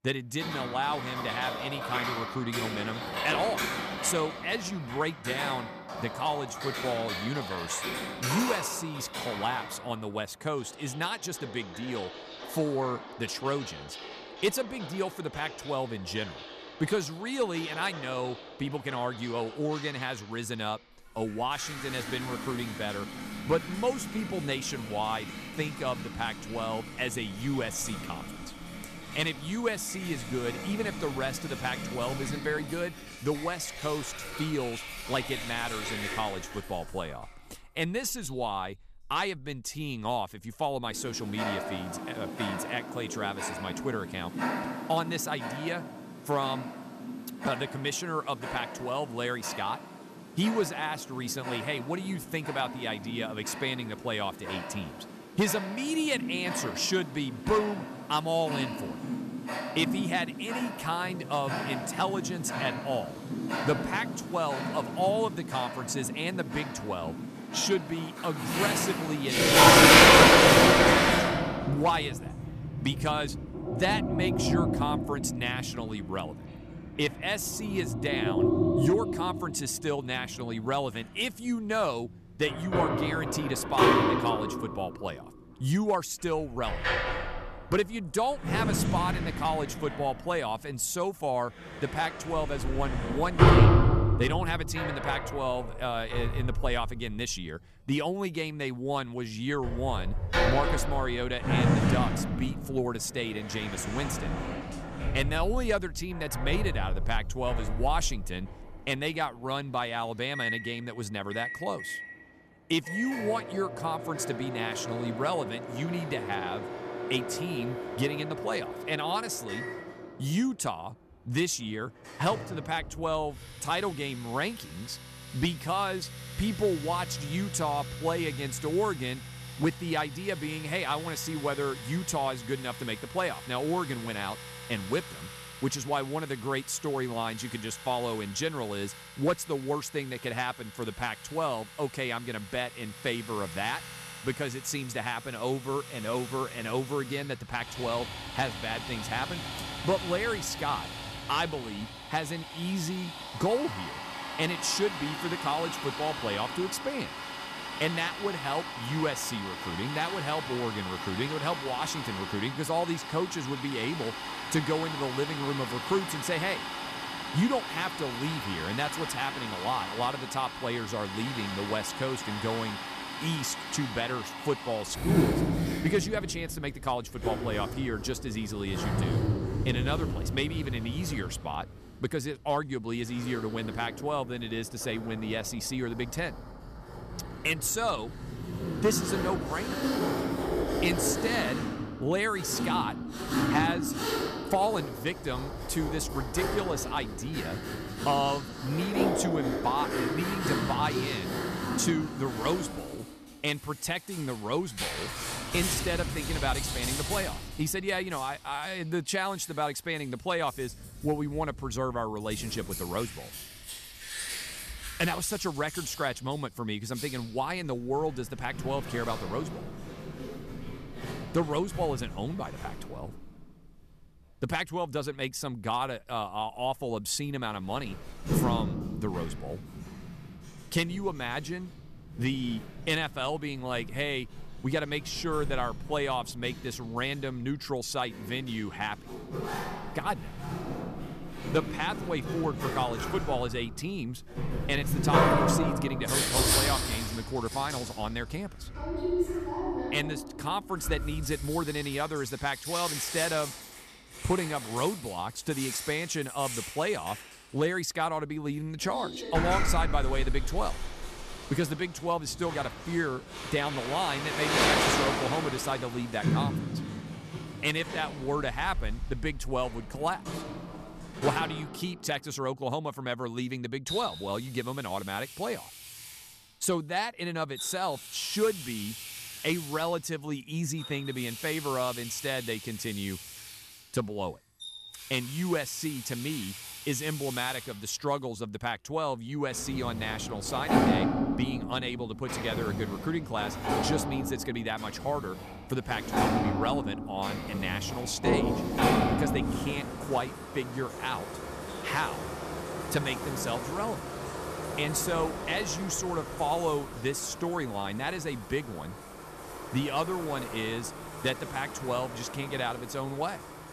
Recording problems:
household noises; very loud; throughout; 1 dB above the speech

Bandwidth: 14.5 kHz